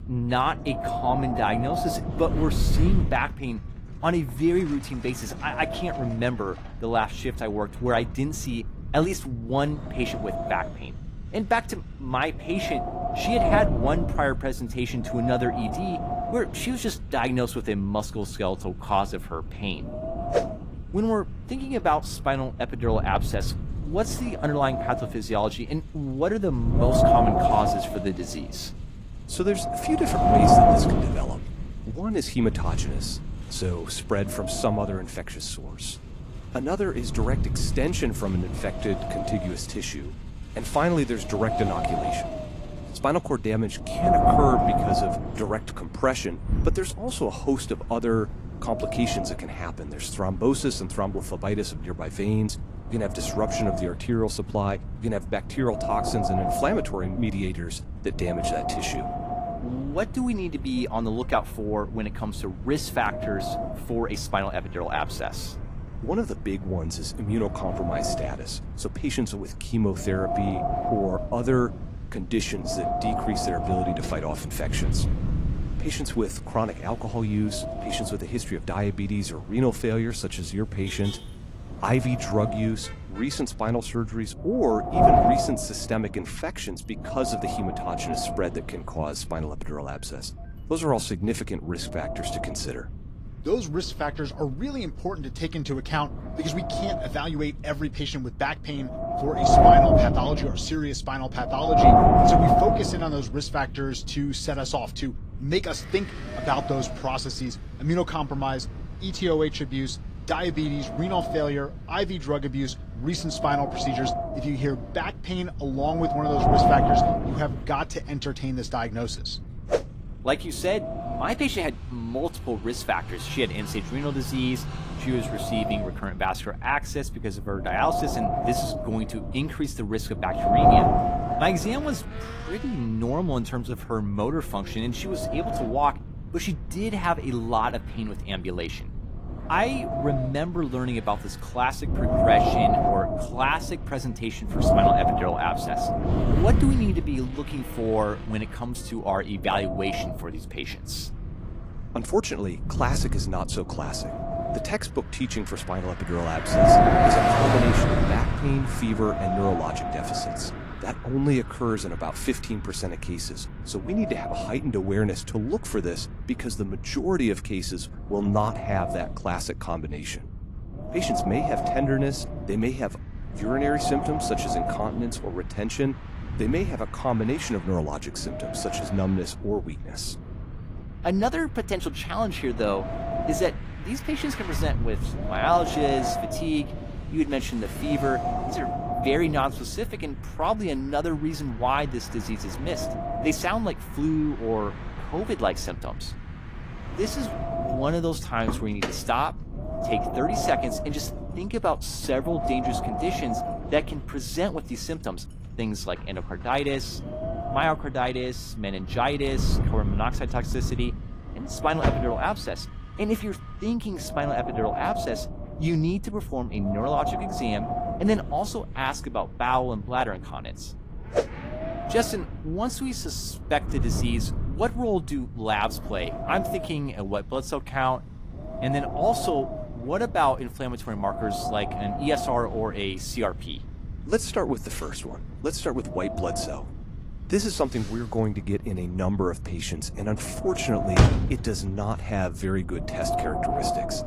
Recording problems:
garbled, watery; slightly; nothing above 15 kHz
wind noise on the microphone; heavy; 4 dB above the speech
traffic noise; noticeable; throughout; 10 dB below the speech

